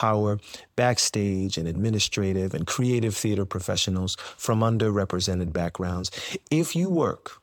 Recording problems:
abrupt cut into speech; at the start

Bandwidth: 18.5 kHz